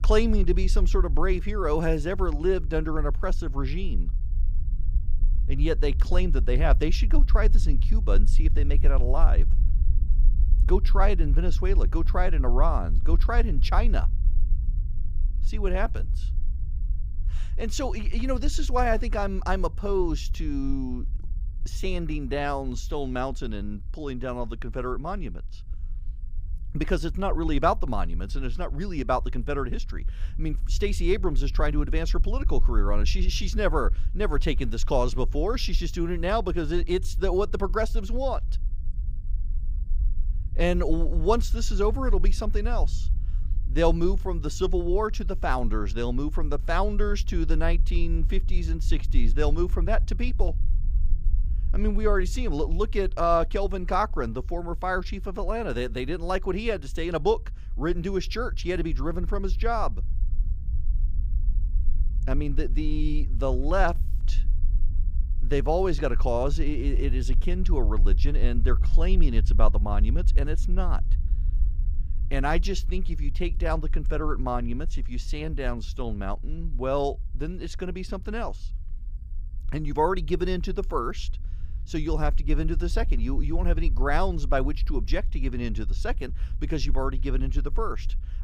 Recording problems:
low rumble; faint; throughout; 20 dB below the speech

